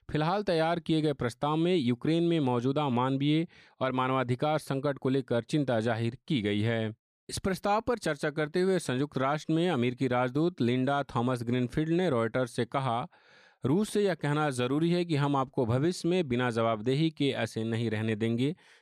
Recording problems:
none

